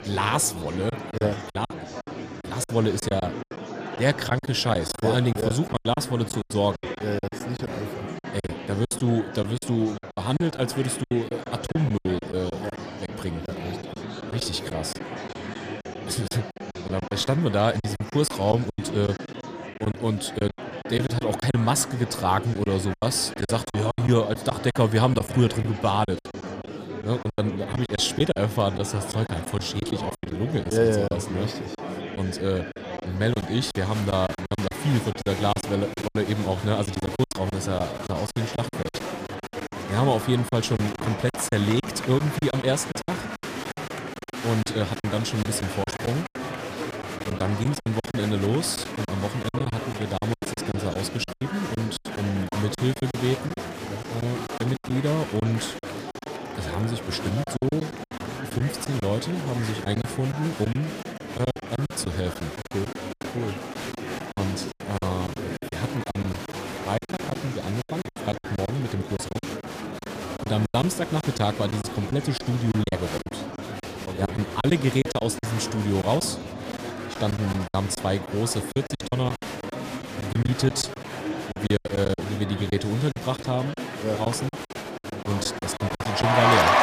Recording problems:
murmuring crowd; loud; throughout; 7 dB below the speech
choppy; very; 12% of the speech affected

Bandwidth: 15 kHz